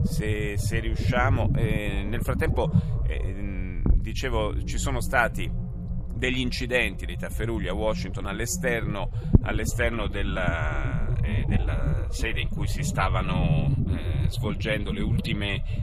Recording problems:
low rumble; noticeable; throughout; 10 dB below the speech

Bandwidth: 14 kHz